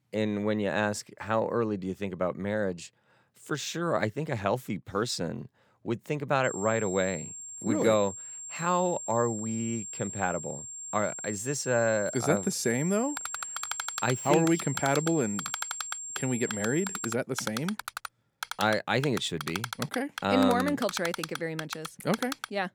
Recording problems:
high-pitched whine; loud; from 6.5 to 17 s; 7.5 kHz, 7 dB below the speech
keyboard typing; noticeable; from 13 s on; peak 5 dB below the speech

